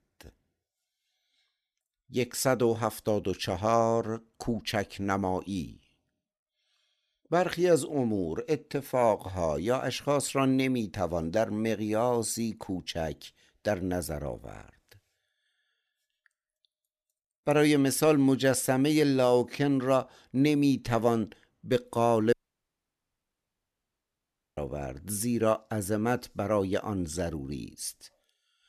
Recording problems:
audio cutting out; at 22 s for 2 s

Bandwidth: 13.5 kHz